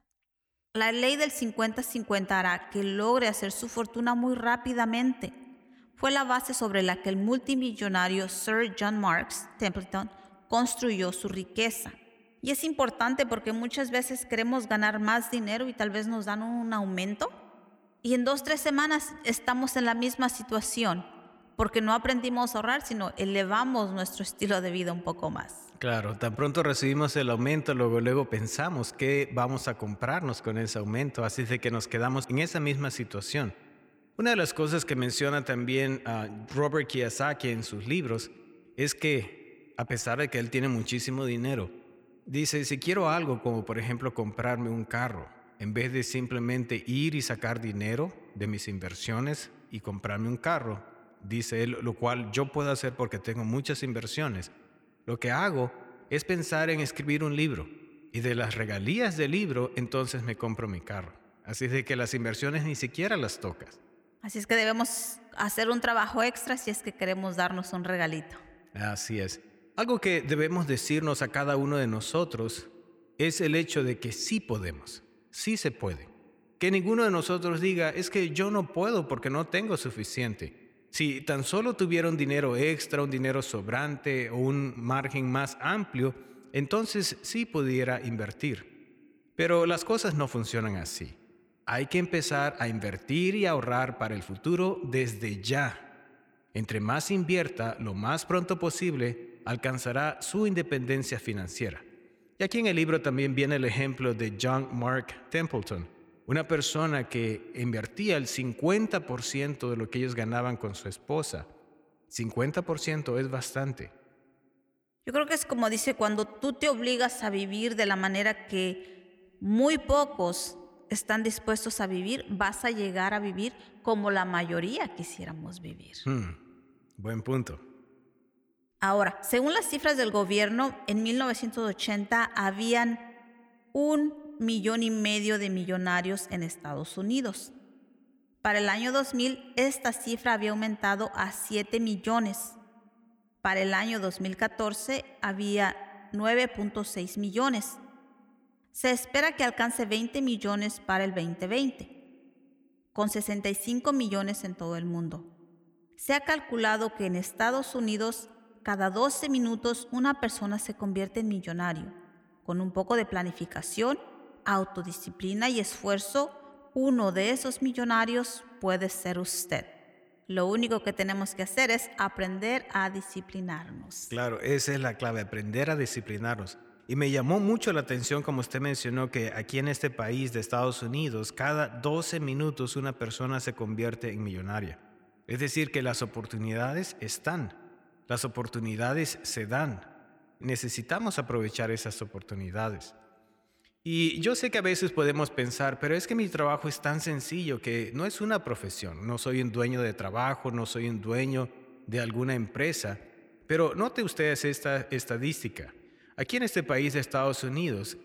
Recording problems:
echo of what is said; faint; throughout; 90 ms later, 20 dB below the speech

